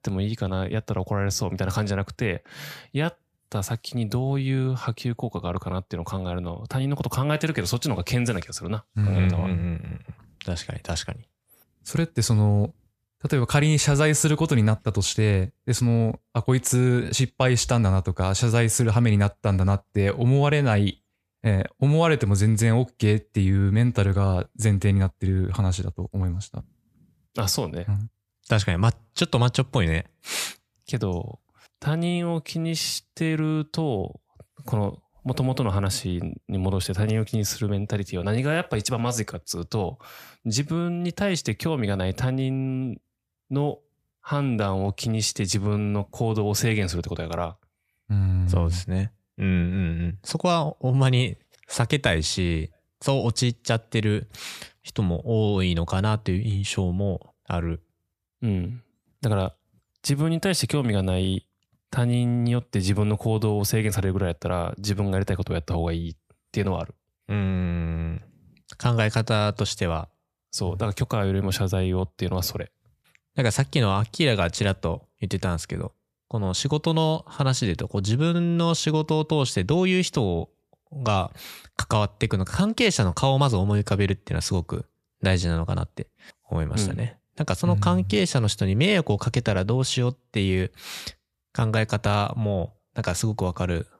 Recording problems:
none

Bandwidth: 14.5 kHz